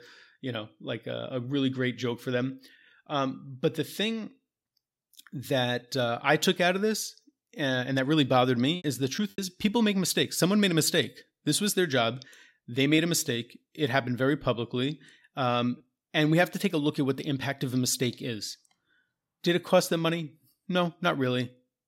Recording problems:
choppy; occasionally; at 9 s; 3% of the speech affected

